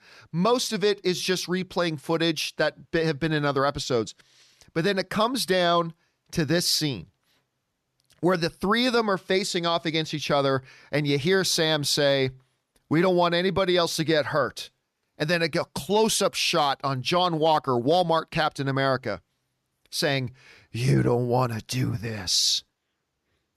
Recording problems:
none

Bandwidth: 13.5 kHz